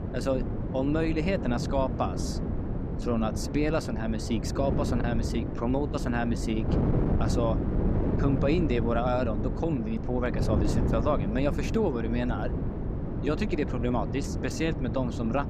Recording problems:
wind noise on the microphone; heavy; 6 dB below the speech

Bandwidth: 15.5 kHz